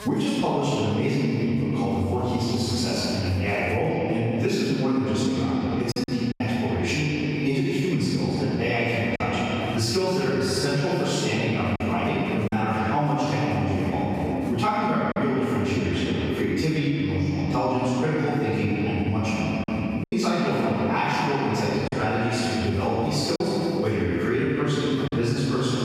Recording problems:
room echo; strong; dies away in 2.7 s
off-mic speech; far
squashed, flat; somewhat
electrical hum; faint; throughout; 60 Hz, 25 dB below the speech
choppy; occasionally; 2% of the speech affected

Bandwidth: 15.5 kHz